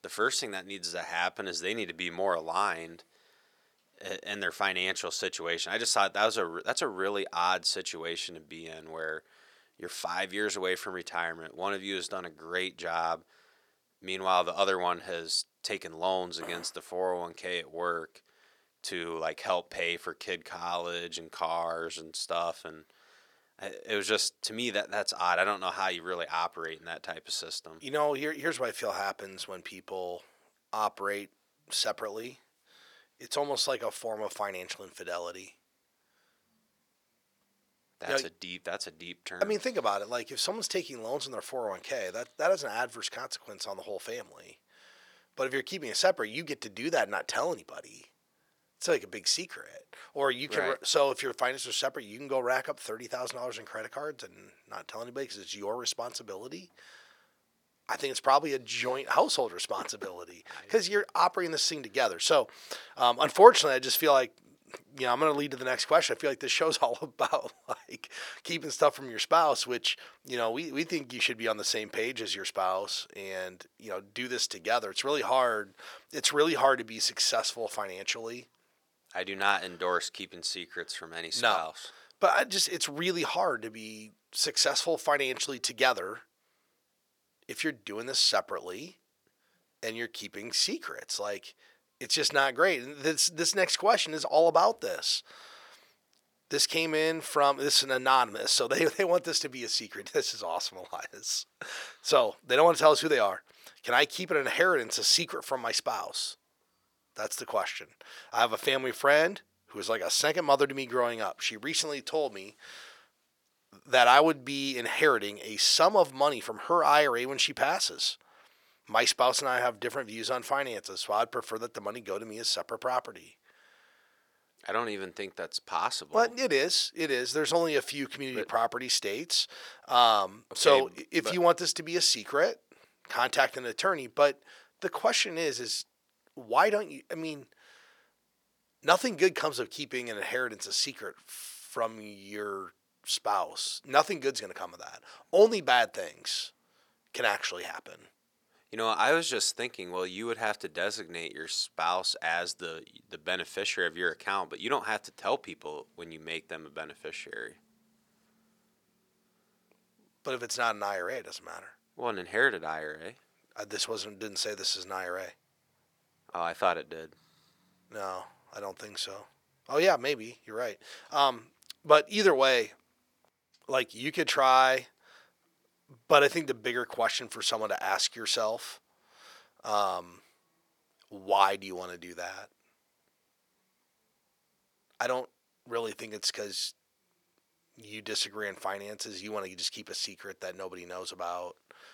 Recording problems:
thin; very; fading below 500 Hz

